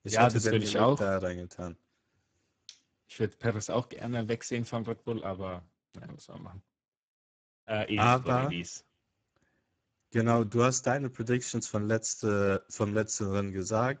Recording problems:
garbled, watery; badly; nothing above 7.5 kHz

